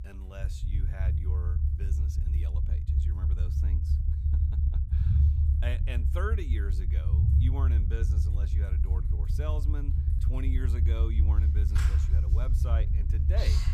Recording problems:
household noises; loud; throughout; 5 dB below the speech
low rumble; loud; throughout; 1 dB below the speech

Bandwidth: 15.5 kHz